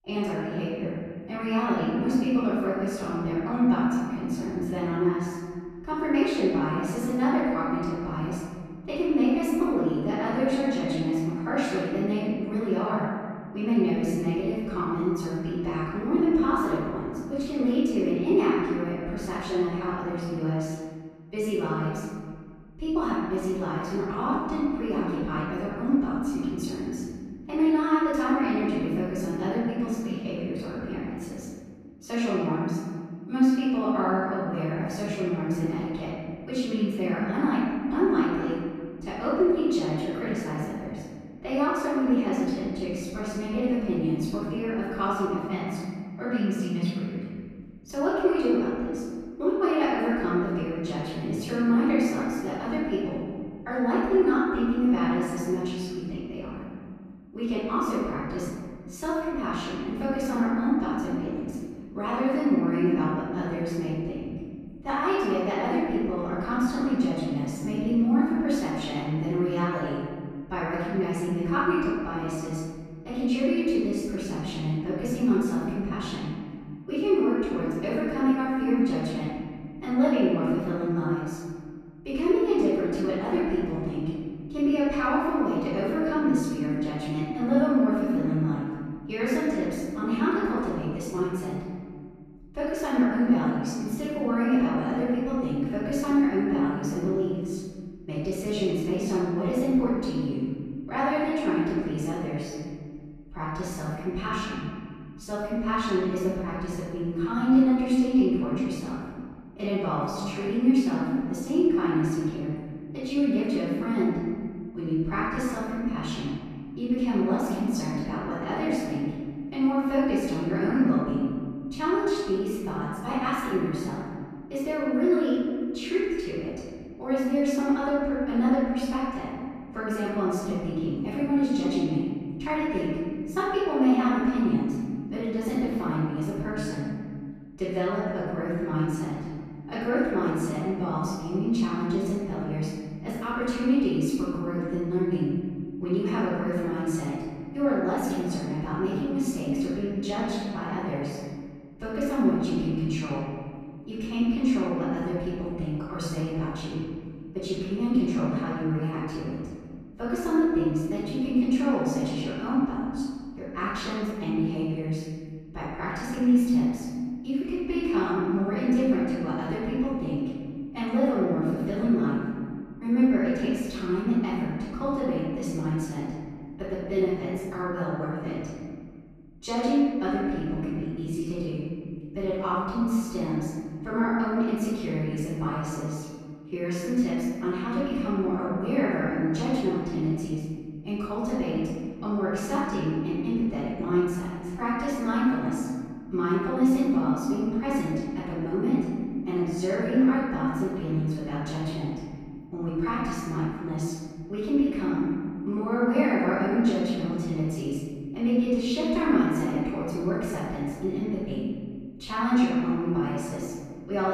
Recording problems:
room echo; strong; dies away in 2 s
off-mic speech; far
abrupt cut into speech; at the end

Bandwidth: 14.5 kHz